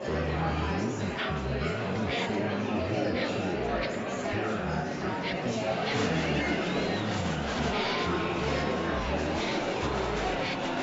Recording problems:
wrong speed and pitch; too slow and too low; 0.6 times normal speed
murmuring crowd; very loud; throughout; 5 dB above the speech

